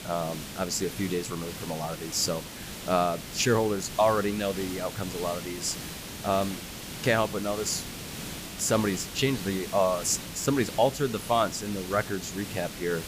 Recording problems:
hiss; loud; throughout; 9 dB below the speech

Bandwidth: 15 kHz